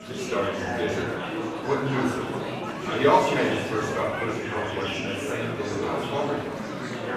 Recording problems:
off-mic speech; far
room echo; noticeable; dies away in 0.7 s
murmuring crowd; loud; throughout; 3 dB below the speech
background music; faint; throughout; 20 dB below the speech

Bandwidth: 15 kHz